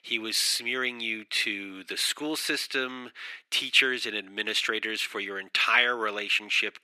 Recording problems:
thin; very; fading below 350 Hz

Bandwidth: 14 kHz